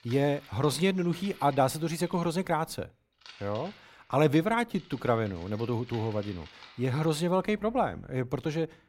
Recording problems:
household noises; faint; throughout; 20 dB below the speech

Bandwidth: 16 kHz